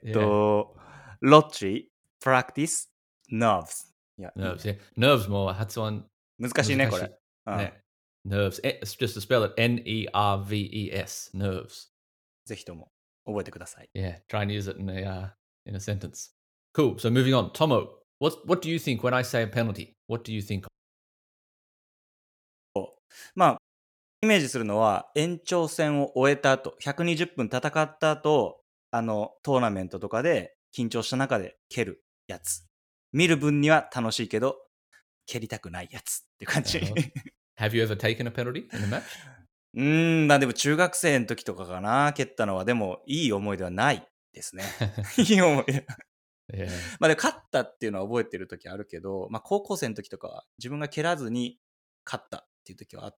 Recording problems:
audio cutting out; at 21 s for 2 s and at 24 s for 0.5 s

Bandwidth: 17 kHz